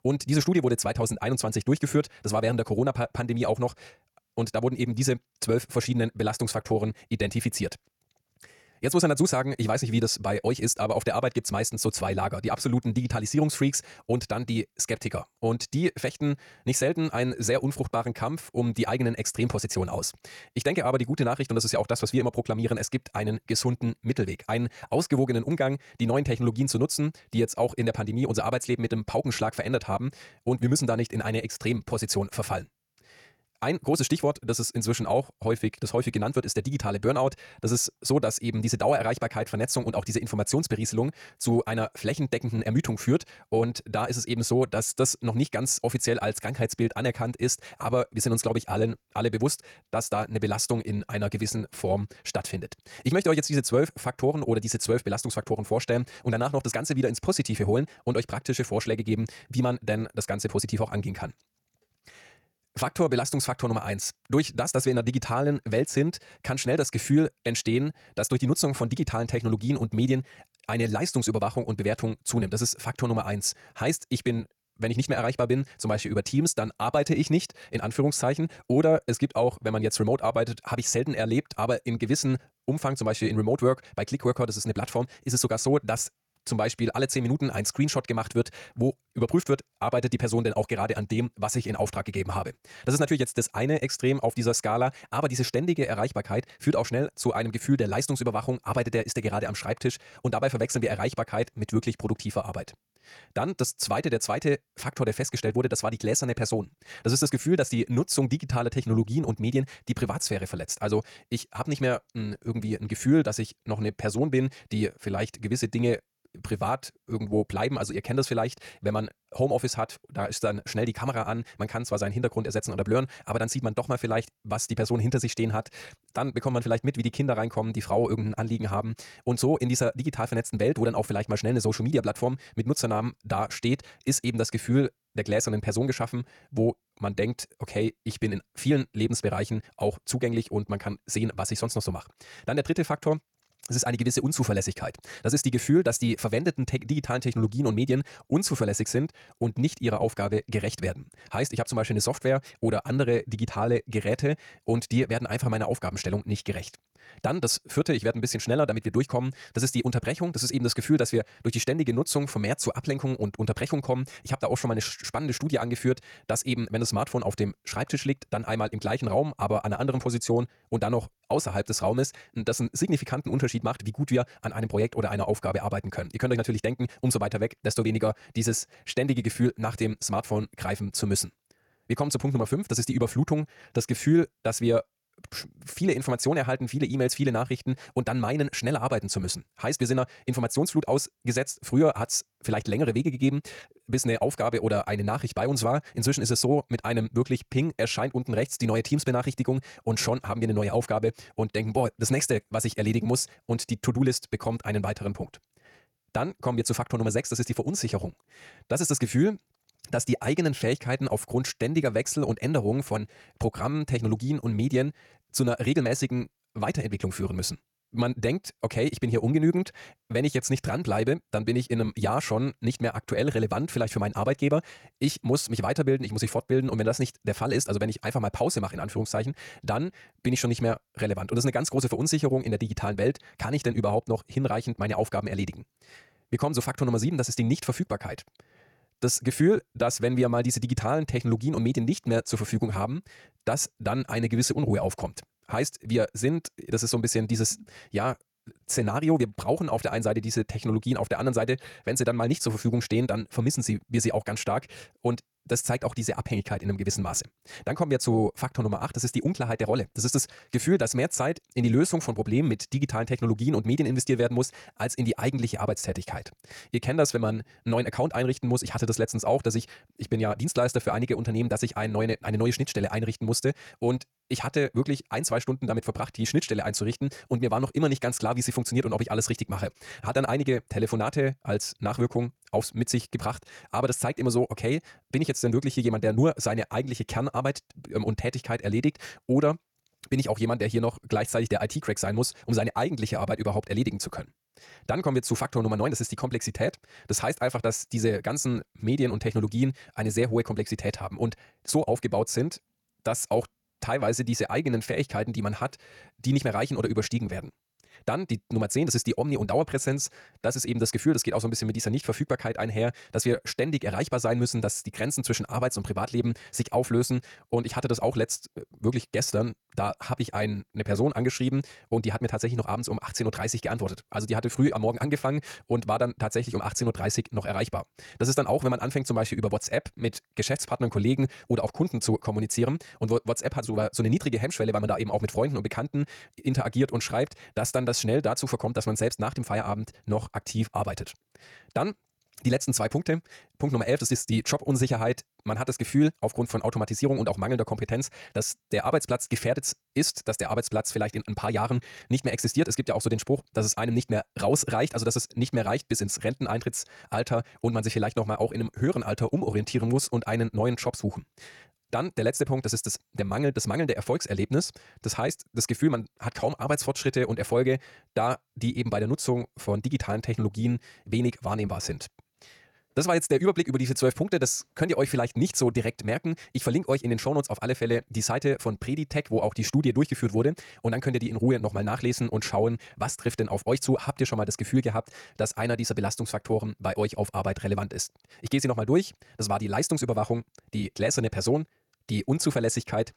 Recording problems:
wrong speed, natural pitch; too fast; 1.7 times normal speed

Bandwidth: 18 kHz